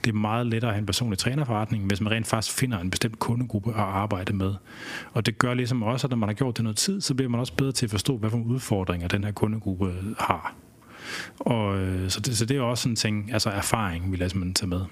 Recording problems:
squashed, flat; heavily

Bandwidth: 15 kHz